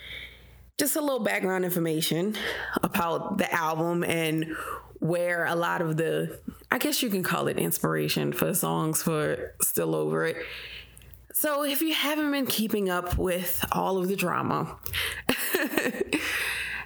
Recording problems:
squashed, flat; heavily

